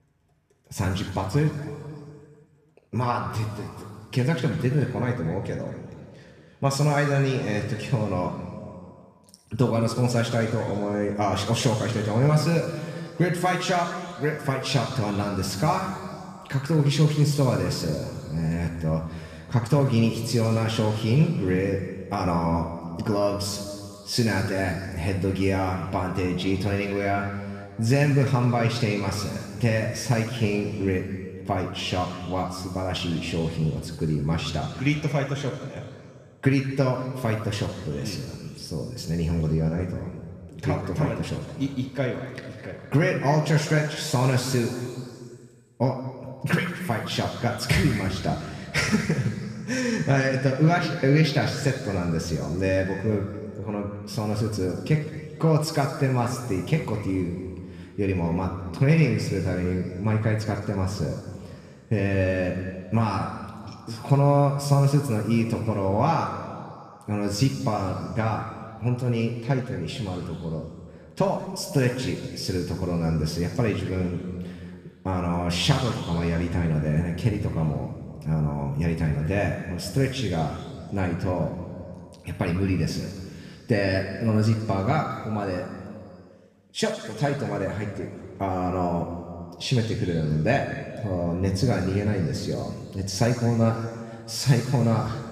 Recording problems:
room echo; noticeable; dies away in 2.1 s
off-mic speech; somewhat distant

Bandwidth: 14.5 kHz